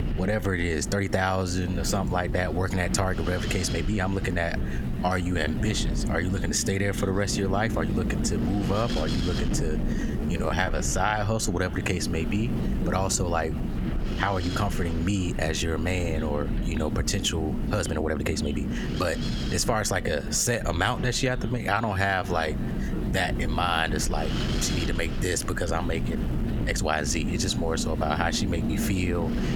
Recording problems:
echo of what is said; faint; throughout; 590 ms later, 25 dB below the speech
squashed, flat; somewhat
wind noise on the microphone; heavy; 10 dB below the speech
uneven, jittery; strongly; from 1 to 27 s

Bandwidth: 17.5 kHz